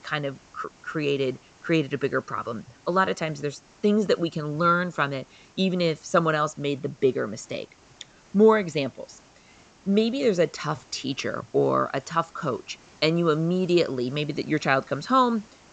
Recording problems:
high frequencies cut off; noticeable; nothing above 8 kHz
hiss; faint; throughout; 30 dB below the speech

